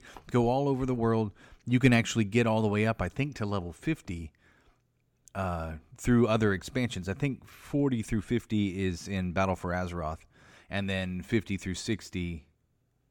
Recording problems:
none

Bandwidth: 18 kHz